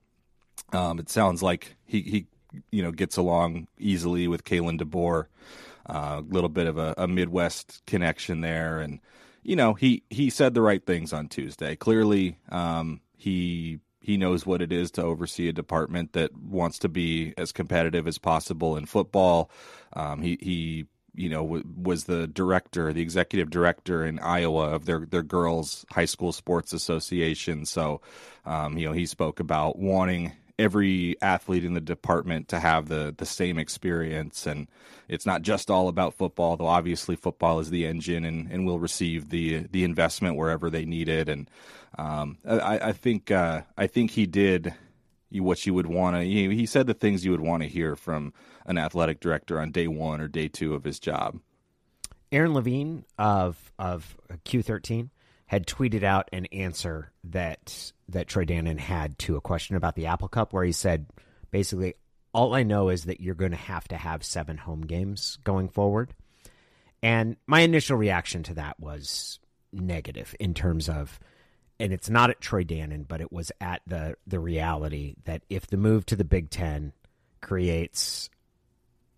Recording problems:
none

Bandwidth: 14.5 kHz